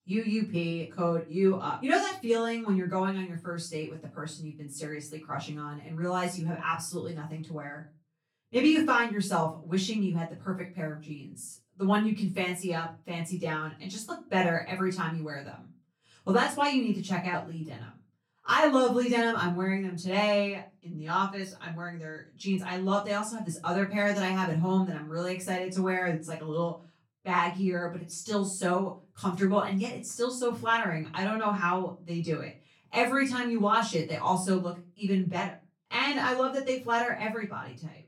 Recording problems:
off-mic speech; far
room echo; slight; dies away in 0.3 s

